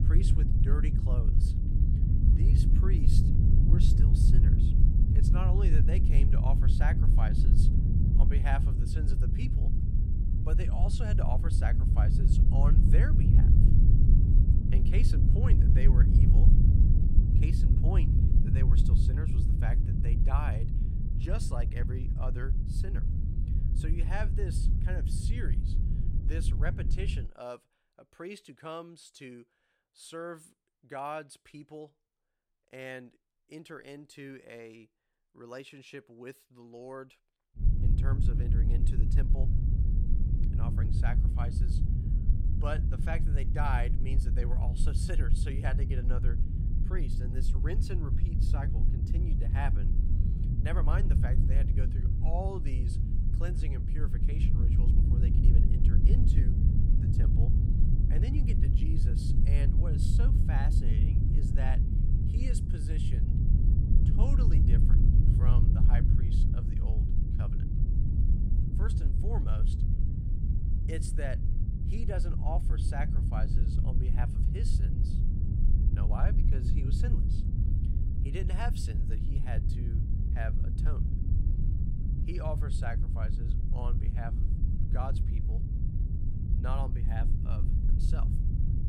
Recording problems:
low rumble; loud; until 27 s and from 38 s on; as loud as the speech

